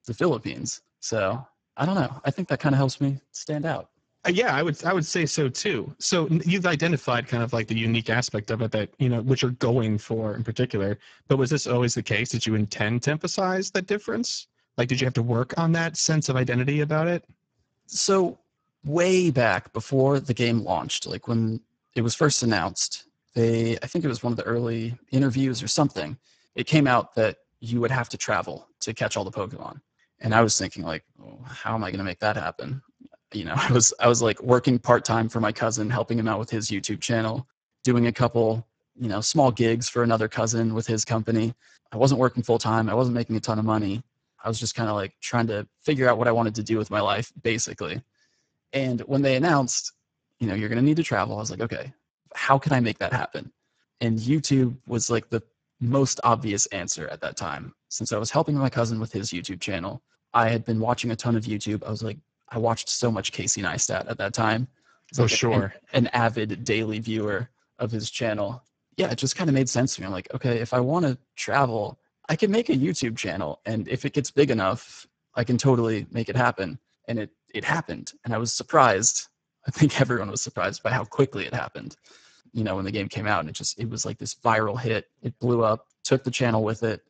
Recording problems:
garbled, watery; badly; nothing above 7.5 kHz

